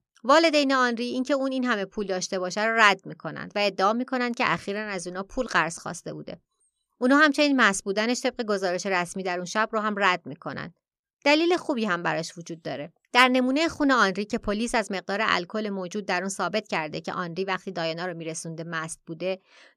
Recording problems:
none

